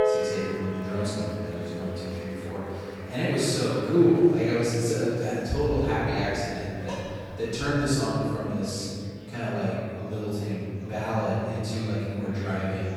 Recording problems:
room echo; strong; dies away in 2.5 s
off-mic speech; far
background music; loud; throughout; 9 dB below the speech
murmuring crowd; faint; throughout; 20 dB below the speech
clattering dishes; faint; at 7 s; peak 15 dB below the speech

